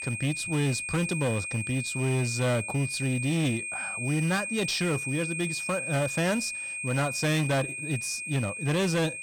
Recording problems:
distortion; slight; 12% of the sound clipped
high-pitched whine; loud; throughout; 2.5 kHz, 4 dB below the speech

